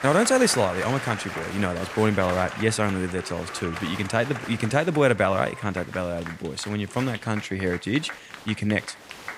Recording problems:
crowd noise; noticeable; throughout; 10 dB below the speech

